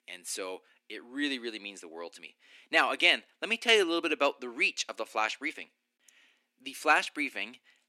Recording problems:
thin; somewhat; fading below 300 Hz

